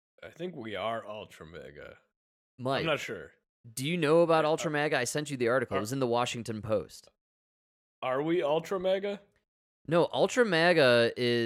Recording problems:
abrupt cut into speech; at the end

